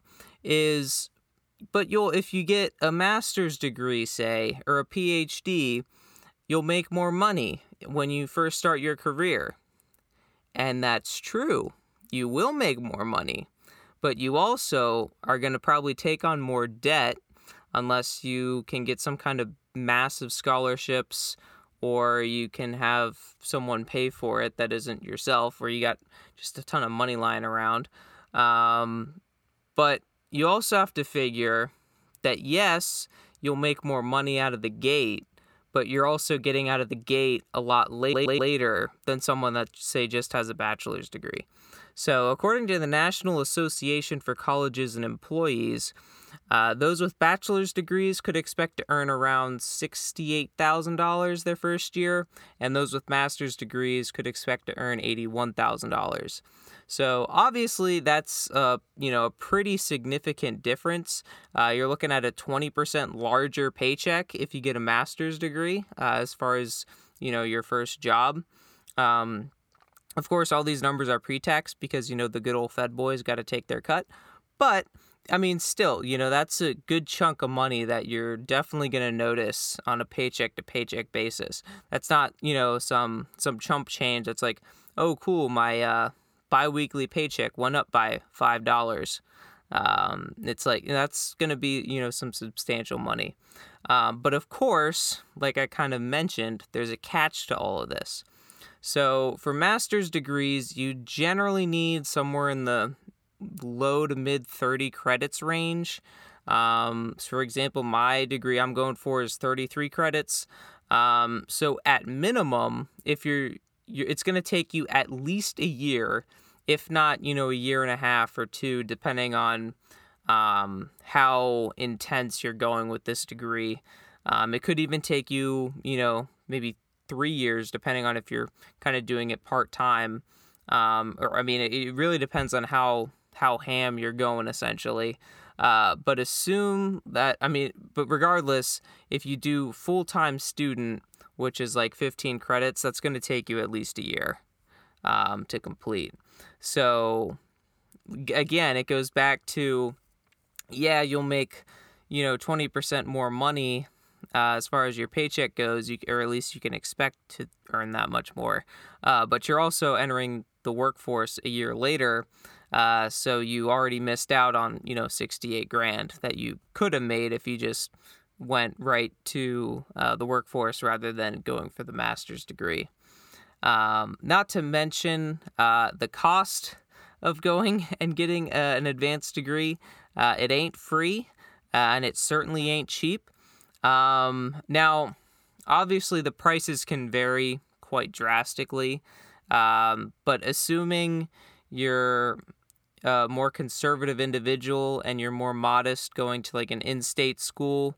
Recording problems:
audio stuttering; at 38 s

